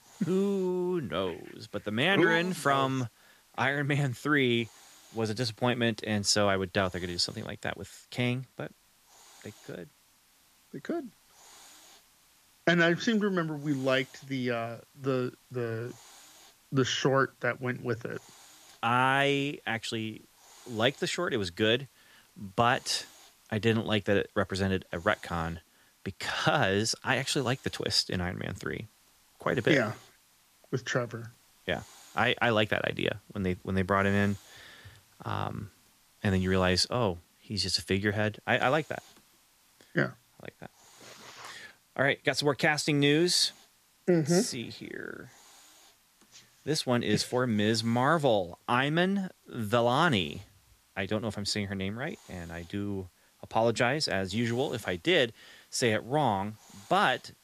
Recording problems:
hiss; faint; throughout; 30 dB below the speech

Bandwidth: 14.5 kHz